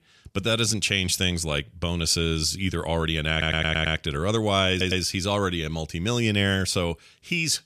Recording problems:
audio stuttering; at 3.5 s and at 4.5 s

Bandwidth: 14.5 kHz